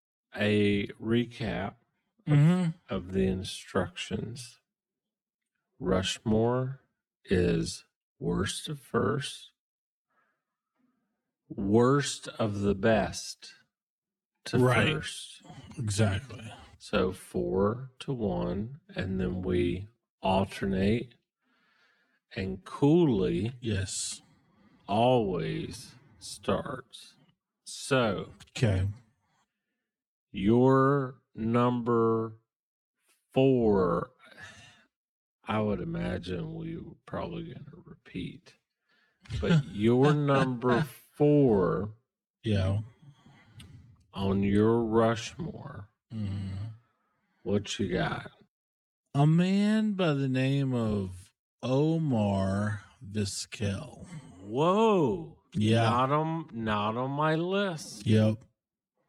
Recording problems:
wrong speed, natural pitch; too slow; 0.6 times normal speed

